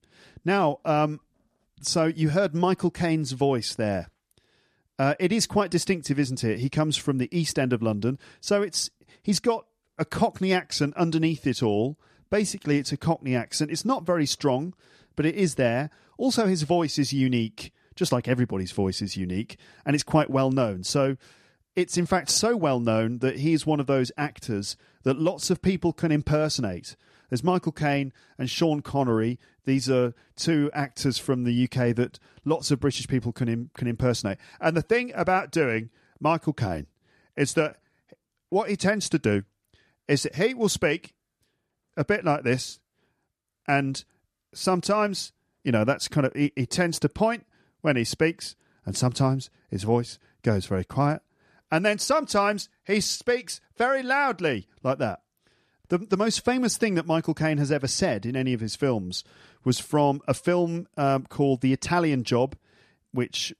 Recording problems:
none

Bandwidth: 13.5 kHz